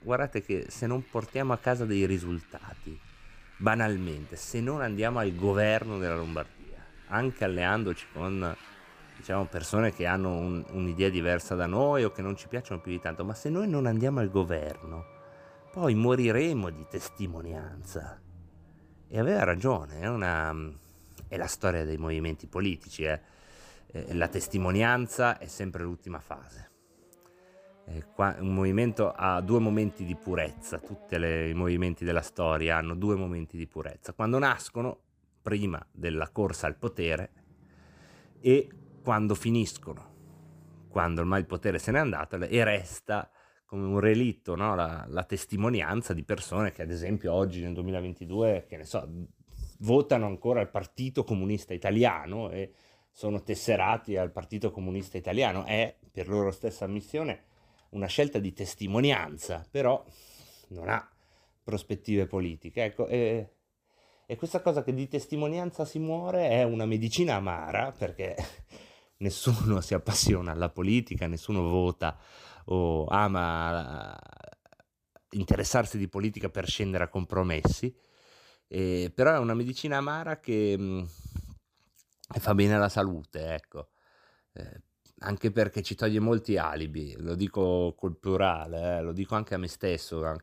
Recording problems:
traffic noise; faint; until 42 s; 25 dB below the speech

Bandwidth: 15 kHz